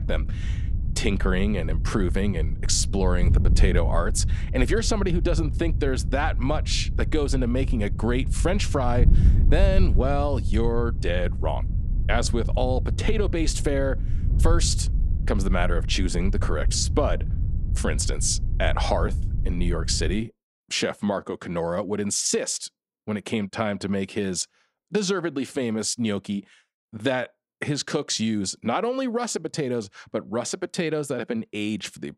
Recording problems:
wind noise on the microphone; occasional gusts; until 20 s; 15 dB below the speech

